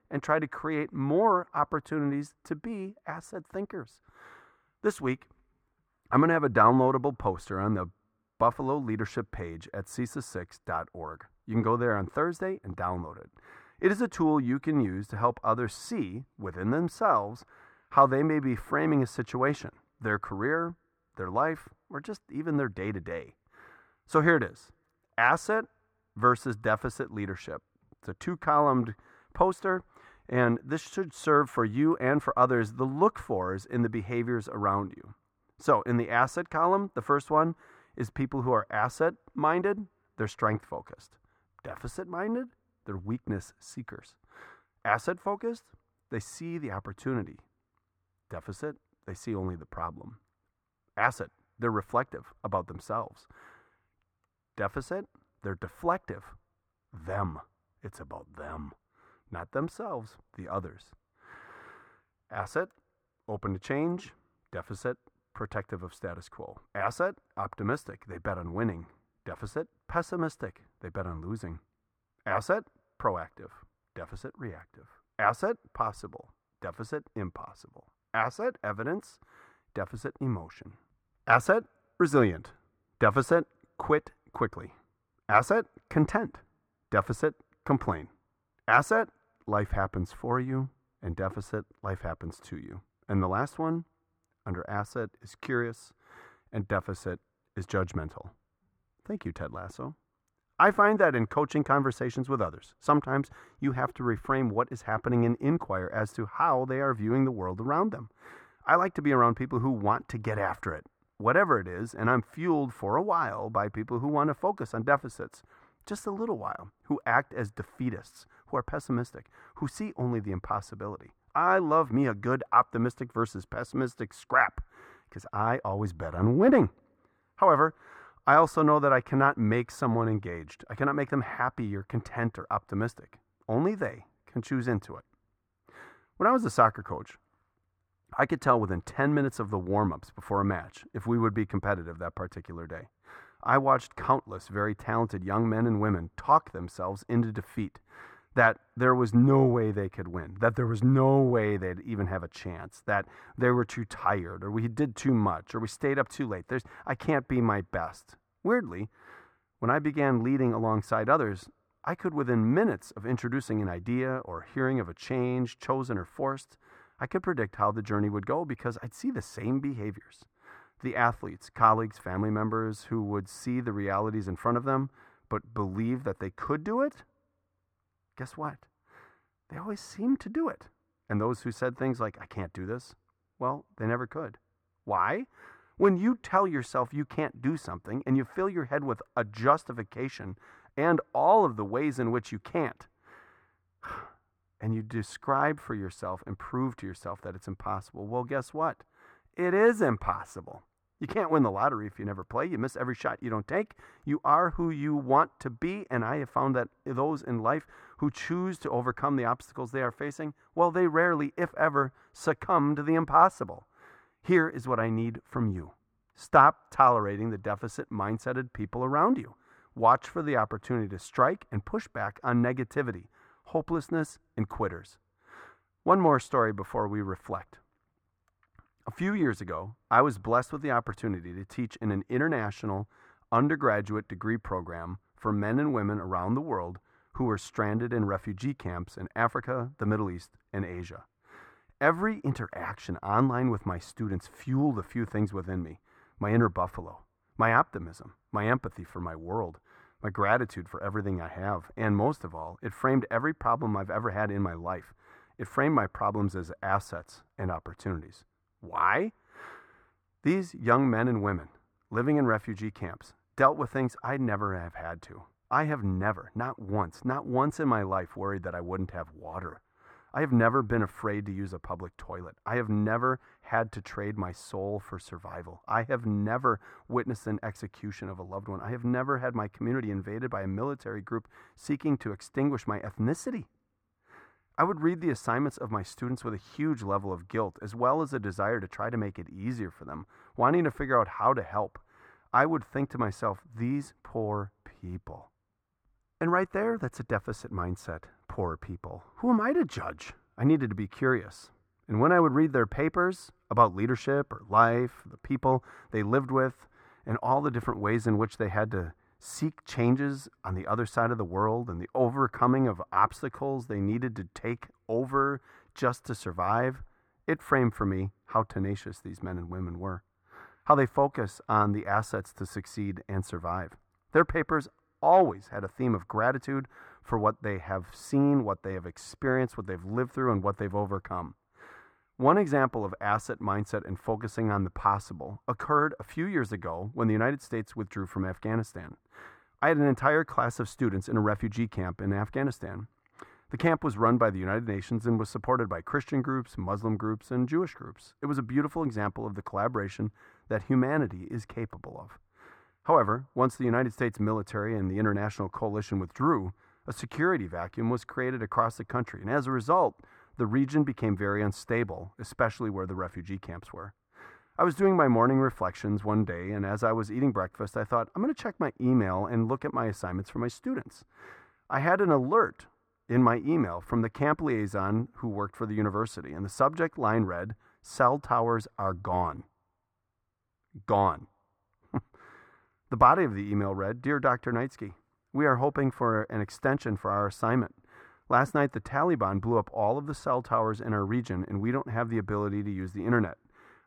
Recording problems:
muffled; very; fading above 4 kHz

